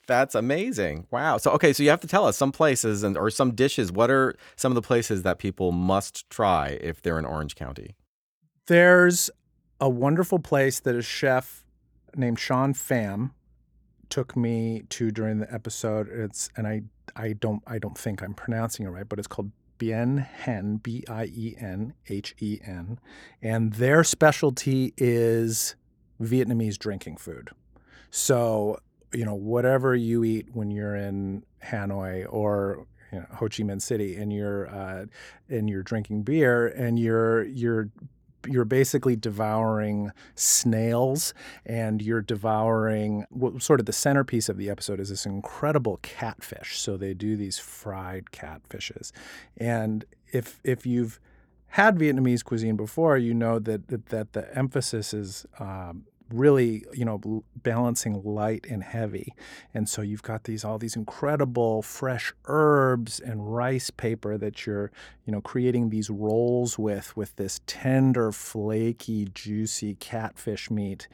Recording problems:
none

